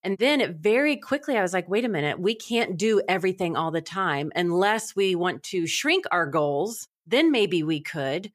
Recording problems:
none

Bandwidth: 15 kHz